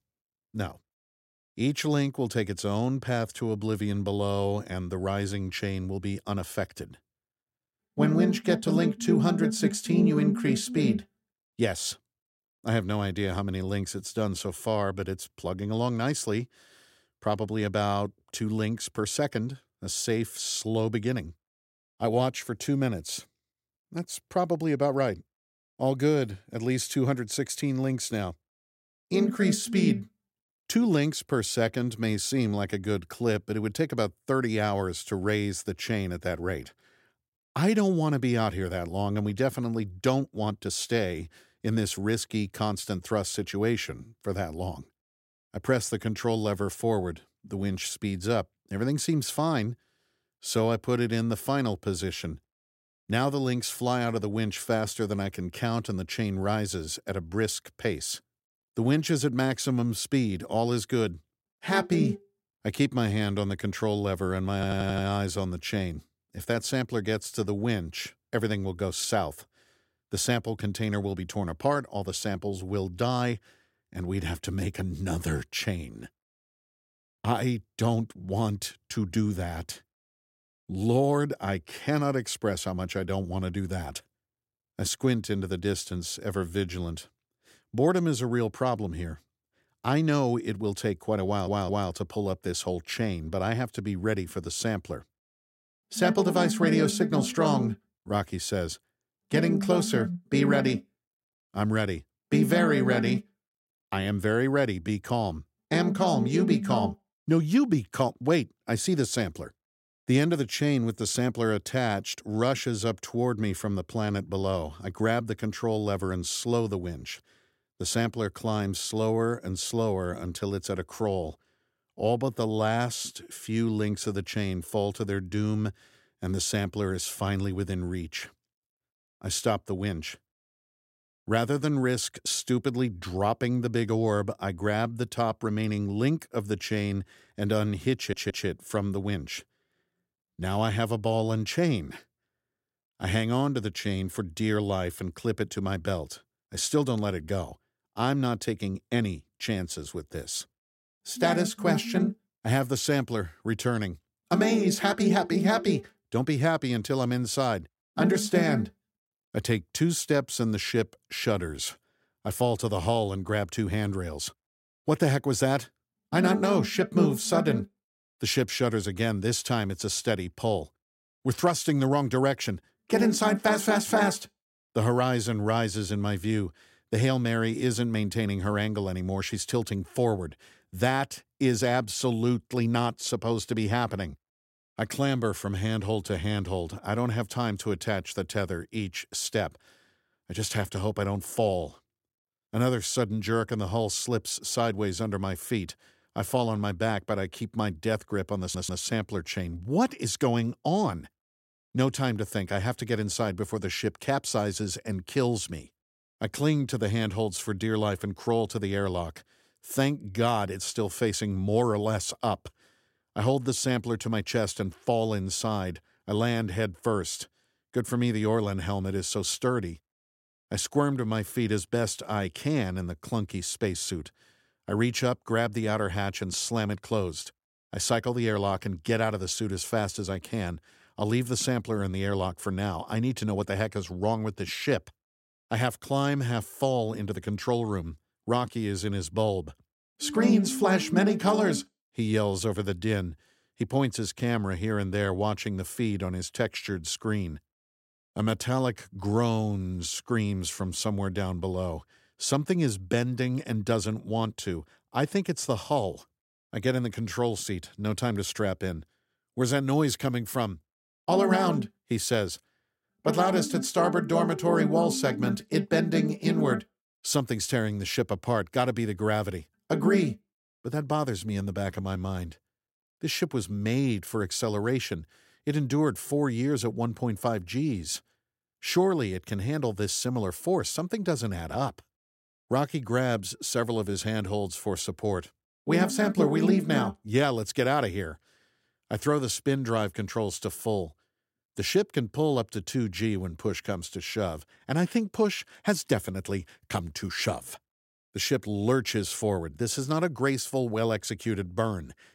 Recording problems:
audio stuttering; 4 times, first at 1:05

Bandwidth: 16 kHz